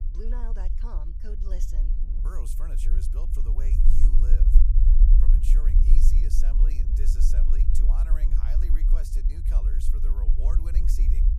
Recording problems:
low rumble; loud; throughout; 1 dB below the speech
wind noise on the microphone; occasional gusts; 20 dB below the speech

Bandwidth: 15.5 kHz